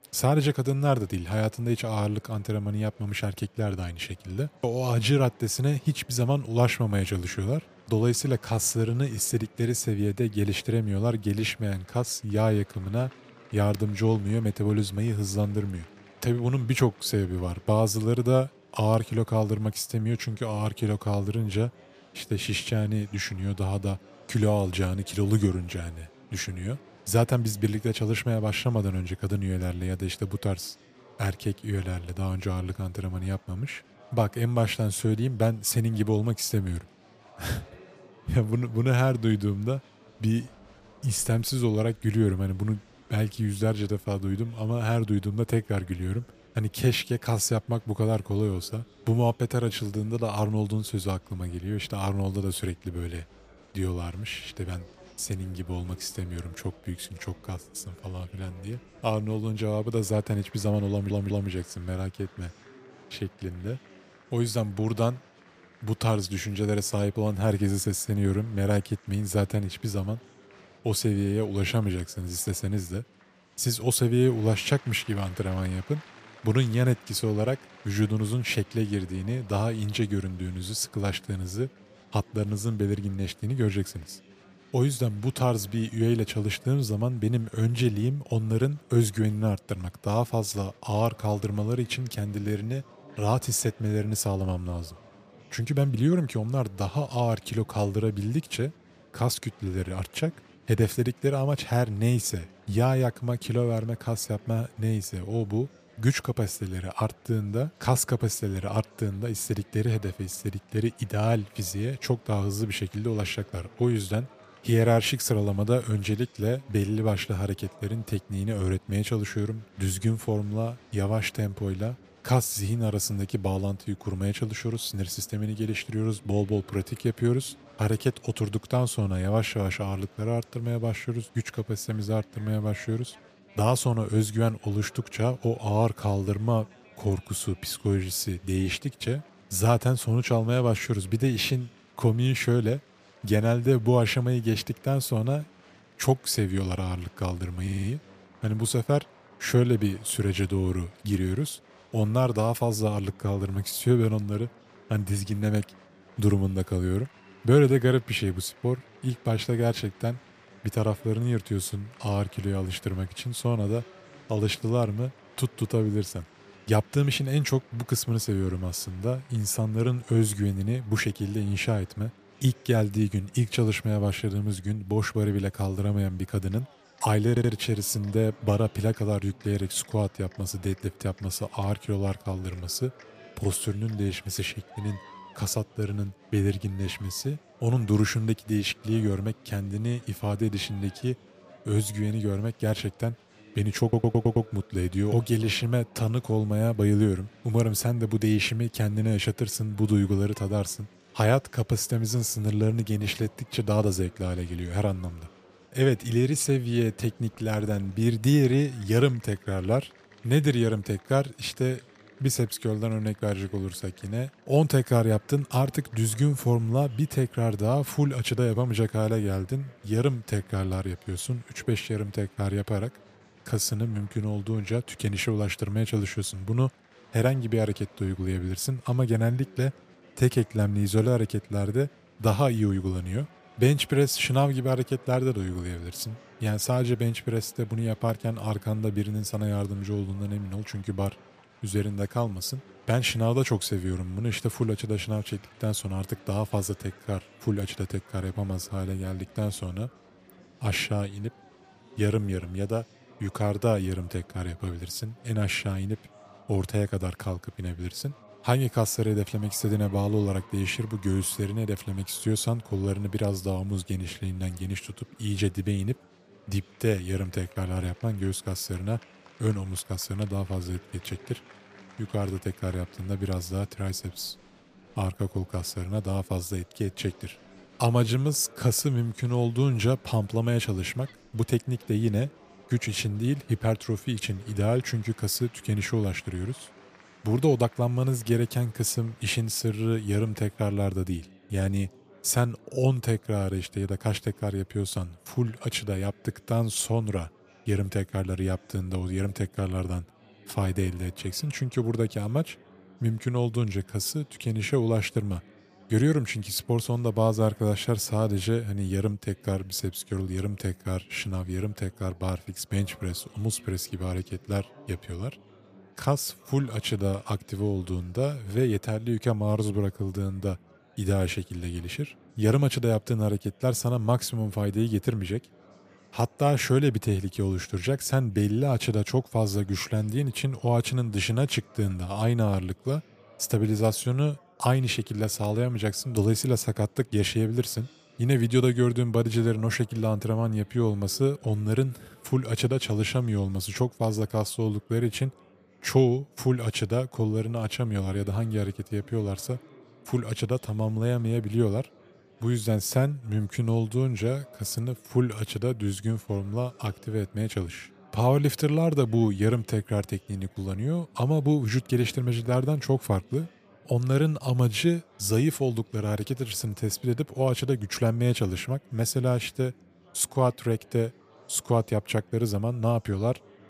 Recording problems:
murmuring crowd; faint; throughout; 25 dB below the speech
audio stuttering; 4 times, first at 1:01

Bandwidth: 15 kHz